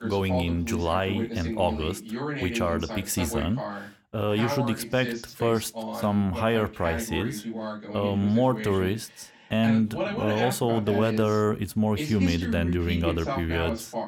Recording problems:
voice in the background; loud; throughout; 6 dB below the speech

